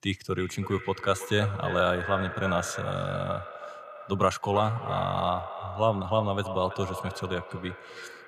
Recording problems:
echo of what is said; strong; throughout; 330 ms later, 9 dB below the speech

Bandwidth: 15 kHz